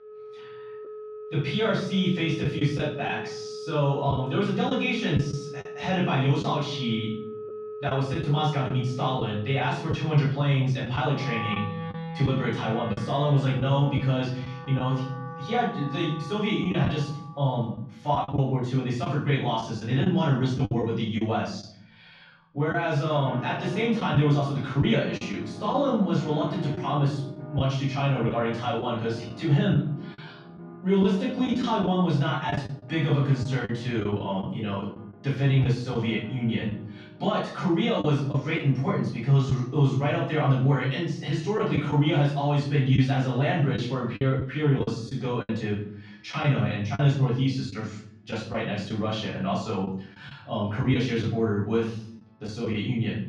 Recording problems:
off-mic speech; far
room echo; noticeable; dies away in 0.6 s
muffled; slightly; fading above 3.5 kHz
background music; noticeable; throughout; 15 dB below the speech
choppy; occasionally; 4% of the speech affected

